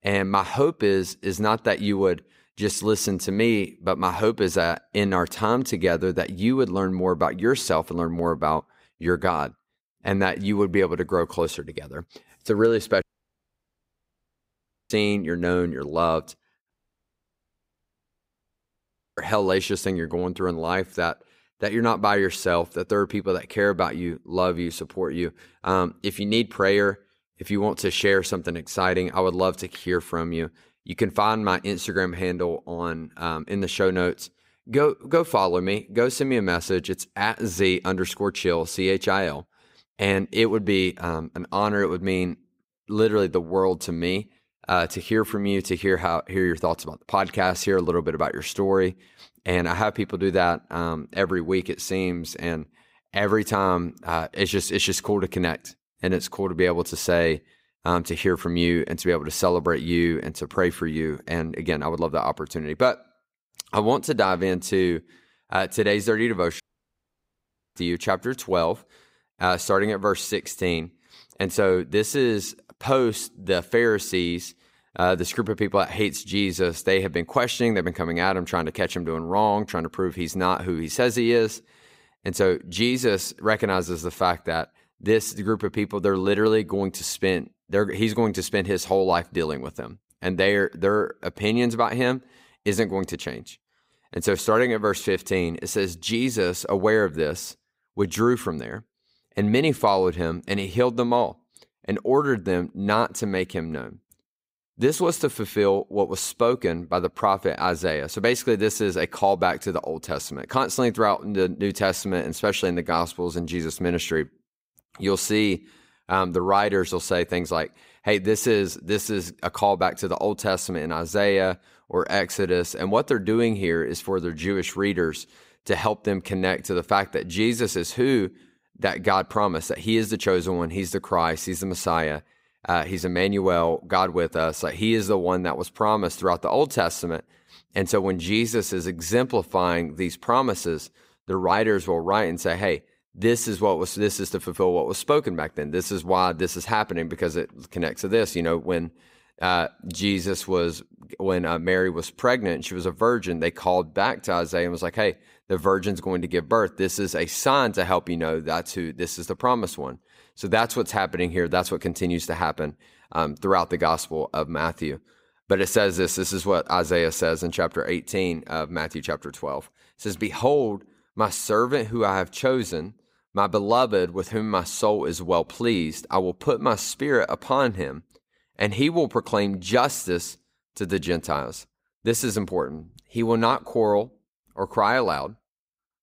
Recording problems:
audio cutting out; at 13 s for 2 s, at 17 s for 2.5 s and at 1:07 for 1 s

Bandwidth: 15.5 kHz